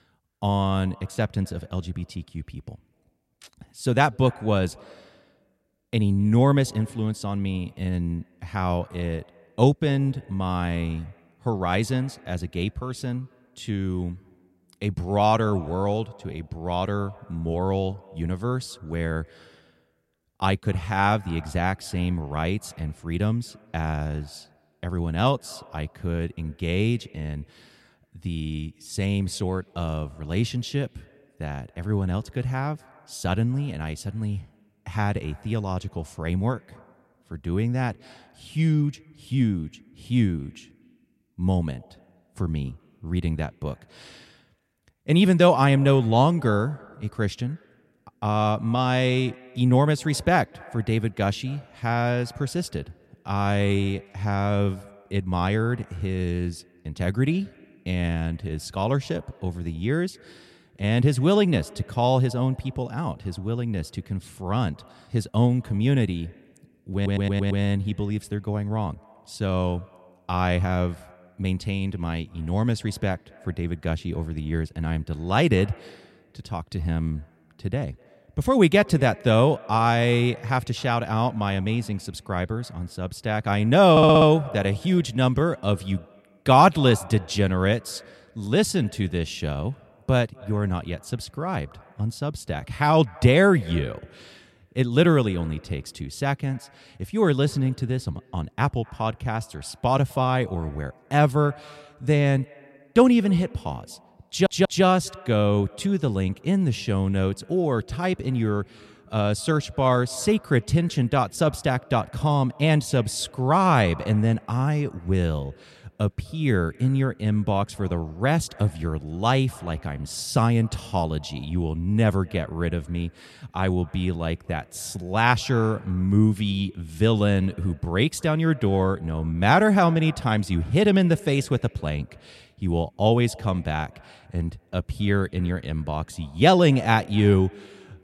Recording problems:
echo of what is said; faint; throughout; 250 ms later, 25 dB below the speech
audio stuttering; at 1:07, at 1:24 and at 1:44

